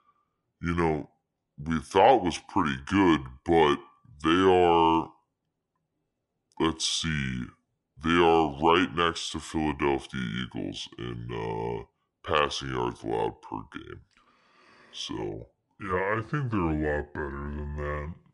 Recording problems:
wrong speed and pitch; too slow and too low; 0.7 times normal speed

